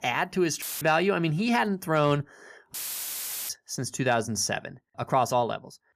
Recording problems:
audio cutting out; filled with static; at 0.5 s and at 2.5 s for 1 s

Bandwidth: 14.5 kHz